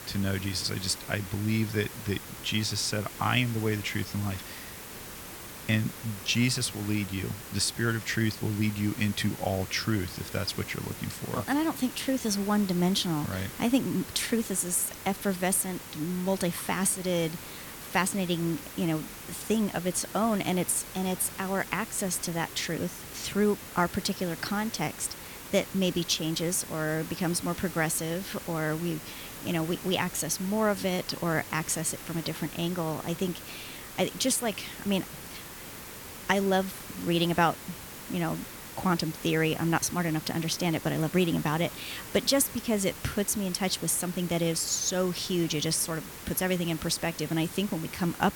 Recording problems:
hiss; noticeable; throughout; 10 dB below the speech

